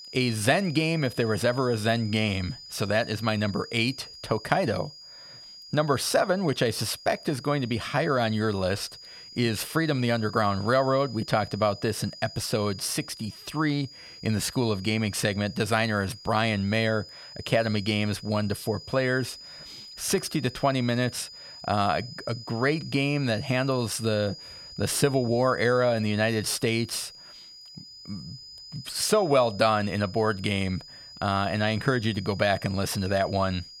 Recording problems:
high-pitched whine; noticeable; throughout; 5 kHz, 15 dB below the speech

